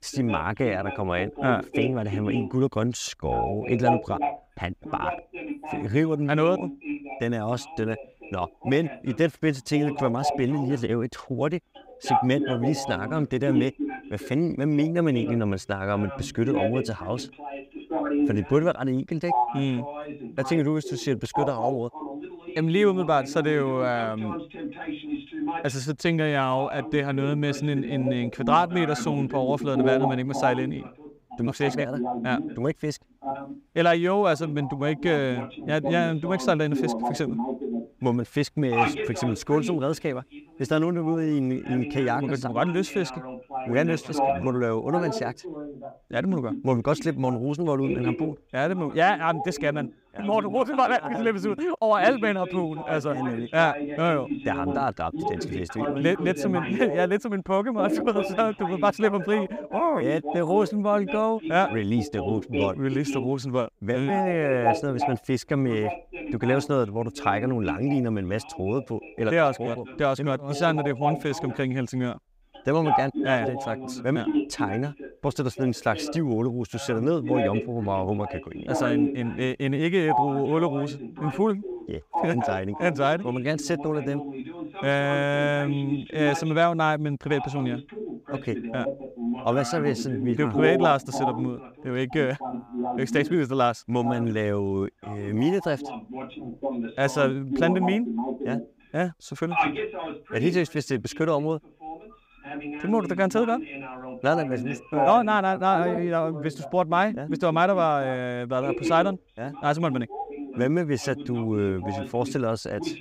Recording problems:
voice in the background; loud; throughout; 6 dB below the speech

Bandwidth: 15.5 kHz